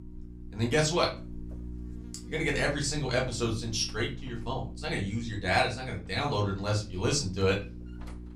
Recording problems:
off-mic speech; far
room echo; very slight; dies away in 0.3 s
electrical hum; faint; throughout; 60 Hz, 20 dB below the speech

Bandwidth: 15.5 kHz